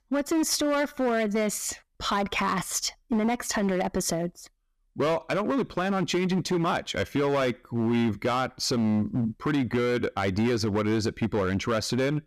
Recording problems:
distortion; slight; 13% of the sound clipped

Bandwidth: 14.5 kHz